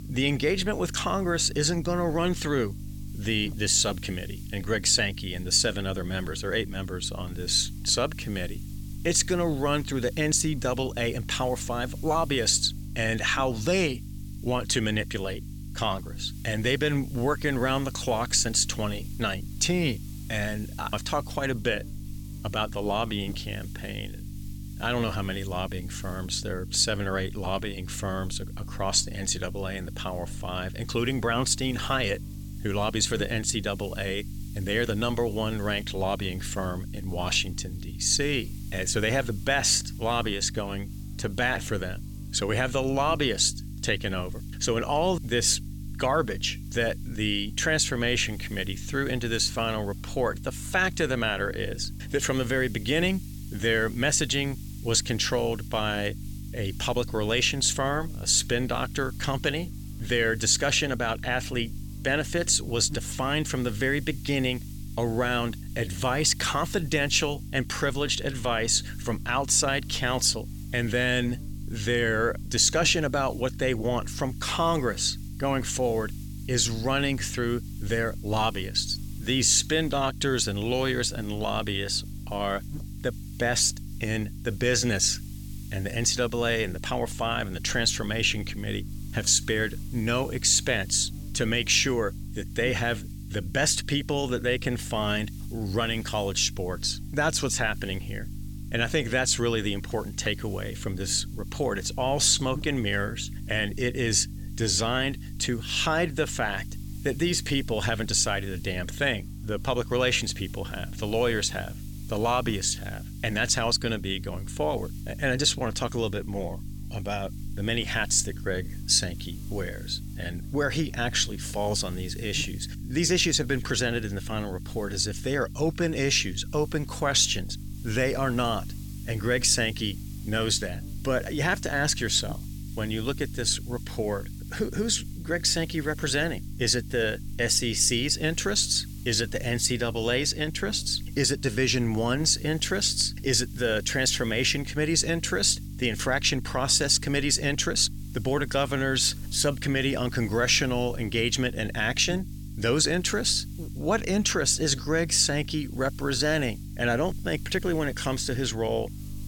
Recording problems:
electrical hum; faint; throughout; 50 Hz, 25 dB below the speech
hiss; faint; throughout; 25 dB below the speech

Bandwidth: 17 kHz